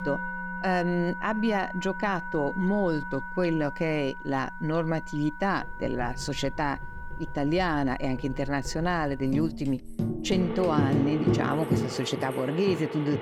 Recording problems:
background music; loud; throughout; 6 dB below the speech
household noises; noticeable; from 5.5 s on; 10 dB below the speech

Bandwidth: 17.5 kHz